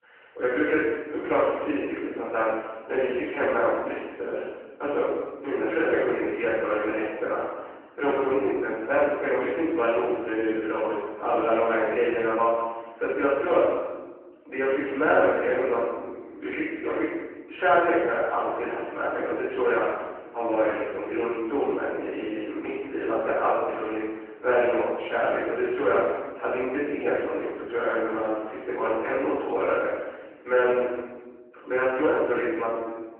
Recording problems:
room echo; strong; dies away in 1.2 s
off-mic speech; far
phone-call audio

